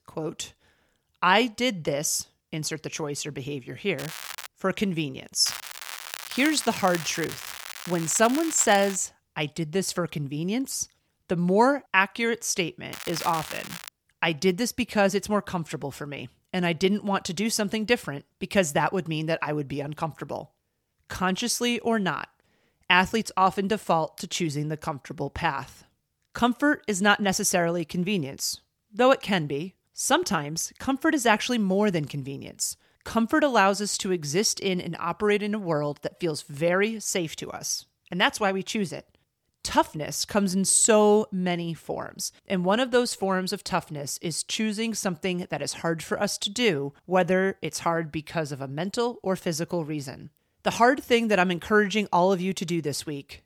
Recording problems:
crackling; noticeable; at 4 s, from 5.5 to 9 s and at 13 s; 10 dB below the speech

